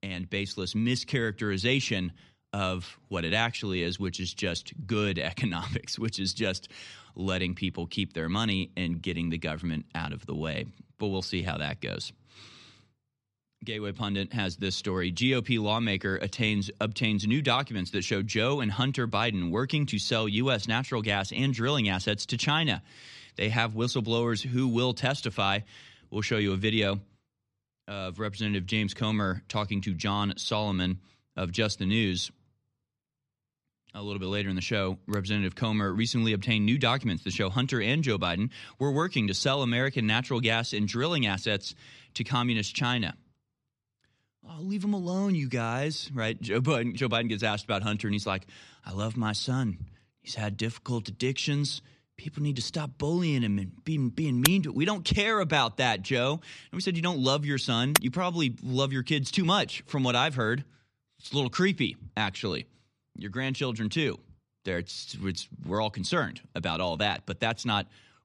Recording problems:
none

